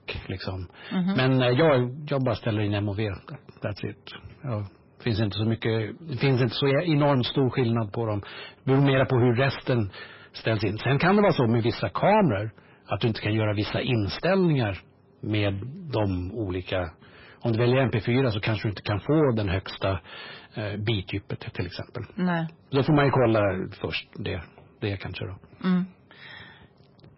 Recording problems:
distortion; heavy; 7 dB below the speech
garbled, watery; badly; nothing above 5.5 kHz

